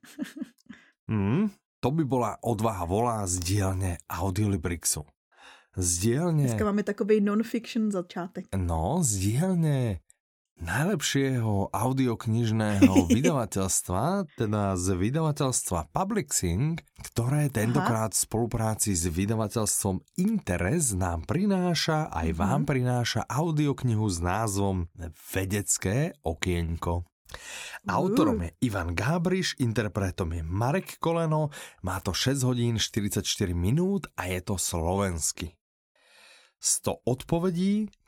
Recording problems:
none

